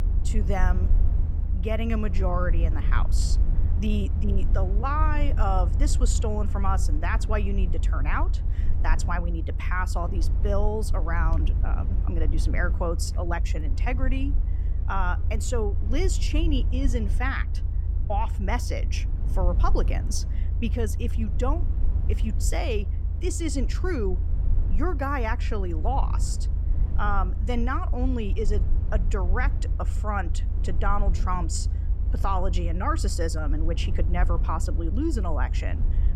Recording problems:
low rumble; noticeable; throughout; 15 dB below the speech

